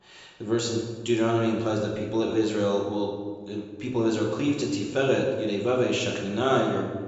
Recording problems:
room echo; noticeable; dies away in 1.2 s
high frequencies cut off; noticeable; nothing above 8 kHz
off-mic speech; somewhat distant

